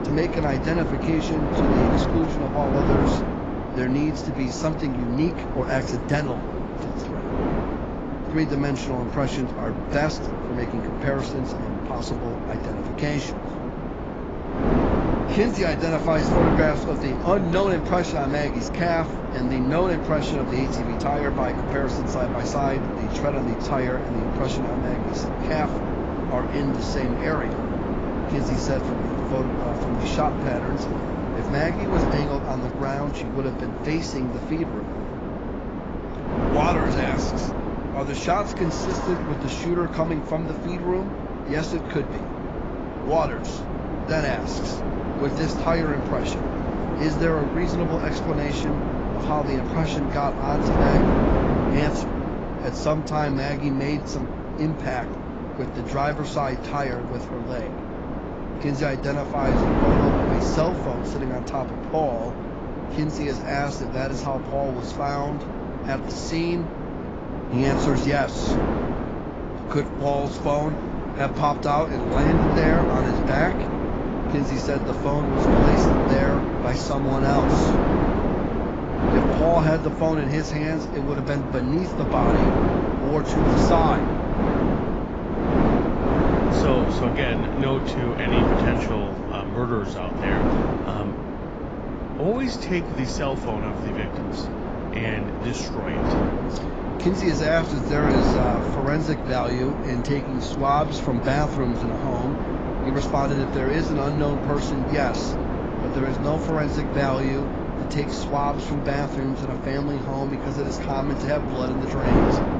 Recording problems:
garbled, watery; badly; nothing above 7.5 kHz
wind noise on the microphone; heavy; 1 dB below the speech
traffic noise; faint; throughout; 20 dB below the speech

